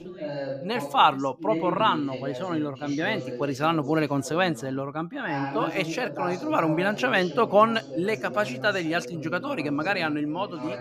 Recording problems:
background chatter; loud; throughout; 2 voices, 10 dB below the speech

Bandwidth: 15 kHz